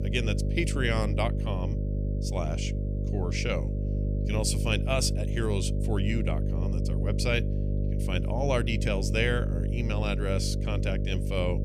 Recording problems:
electrical hum; loud; throughout; 50 Hz, 8 dB below the speech

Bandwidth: 14.5 kHz